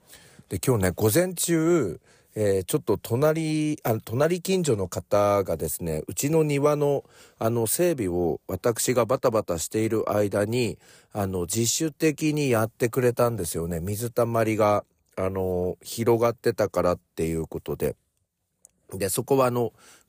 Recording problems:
none

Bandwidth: 15 kHz